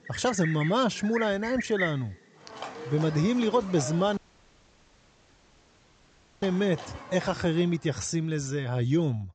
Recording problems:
high frequencies cut off; noticeable; nothing above 8 kHz
animal sounds; noticeable; until 7.5 s; 10 dB below the speech
audio cutting out; at 4 s for 2.5 s

